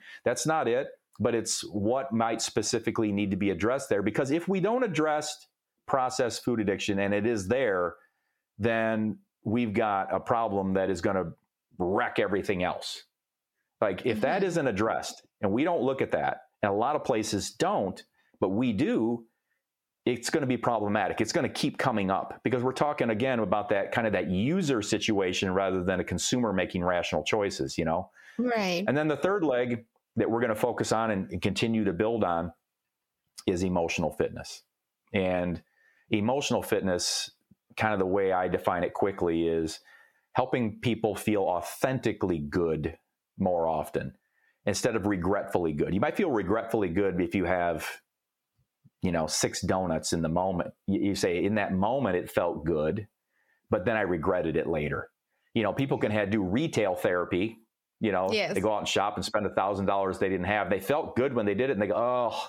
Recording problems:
squashed, flat; heavily

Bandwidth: 17 kHz